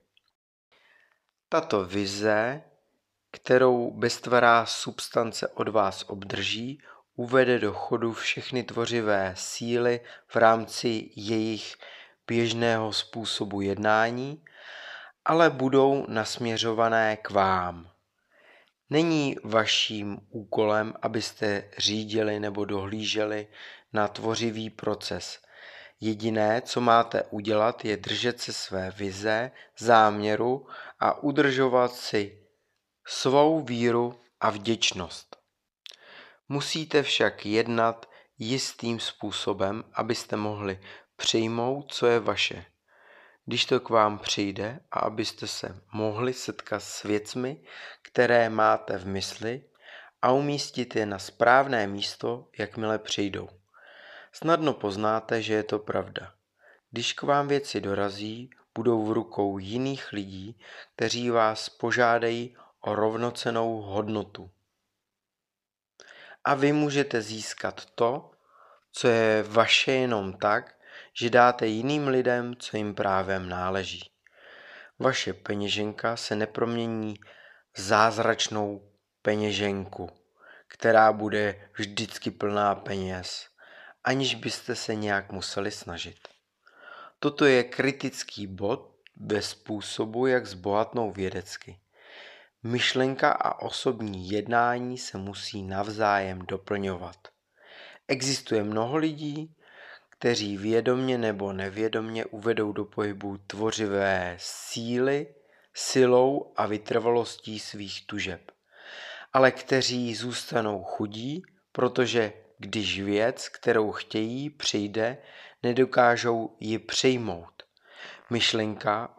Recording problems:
none

